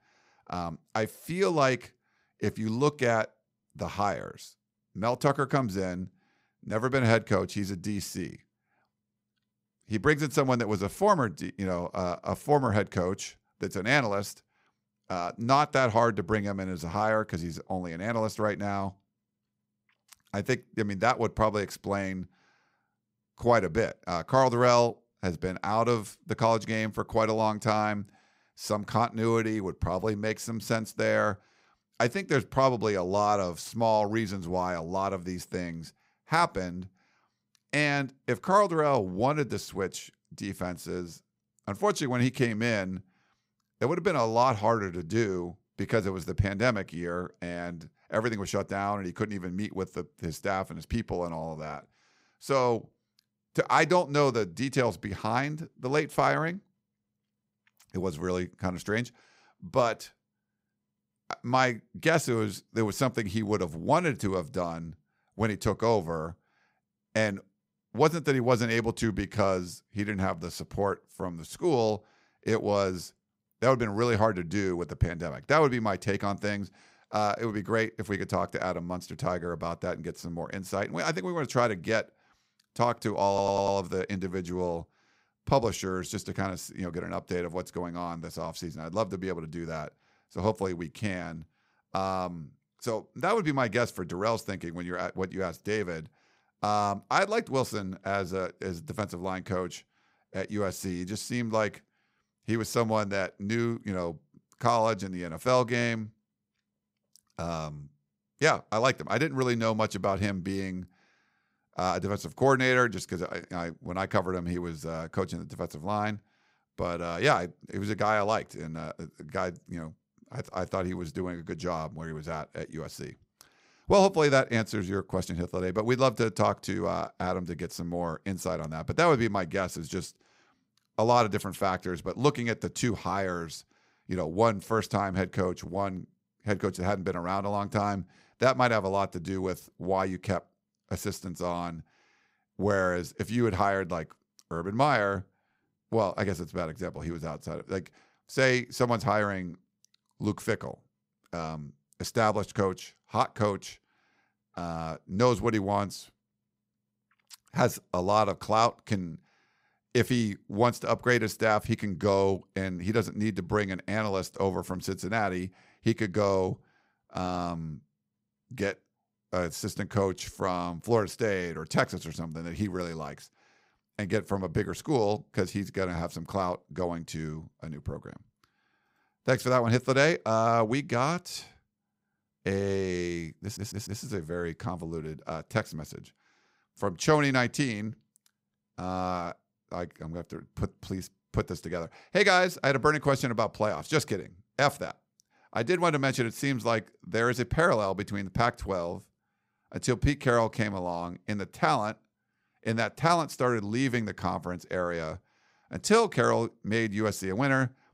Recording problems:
audio stuttering; at 1:23 and at 3:03

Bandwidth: 15.5 kHz